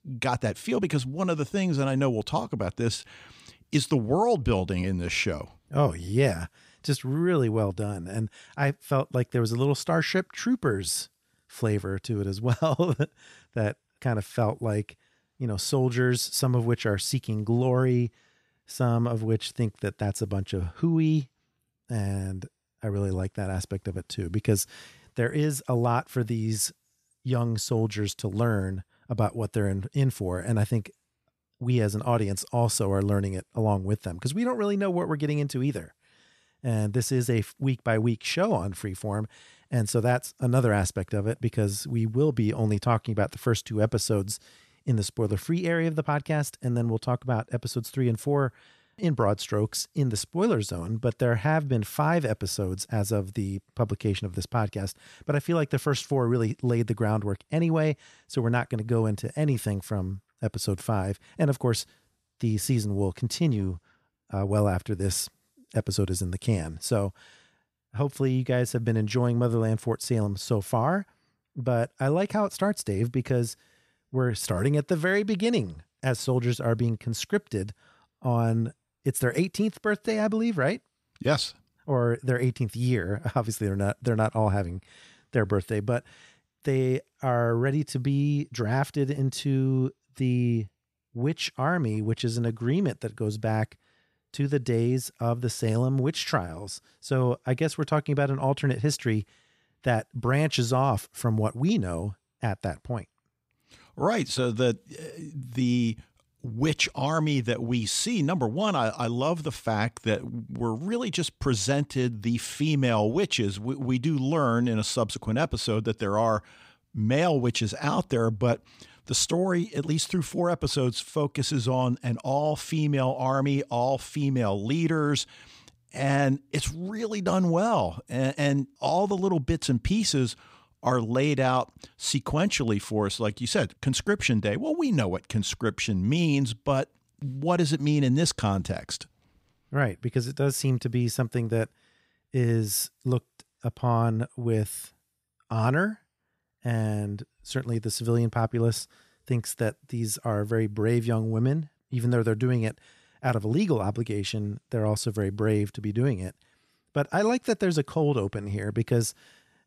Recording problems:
none

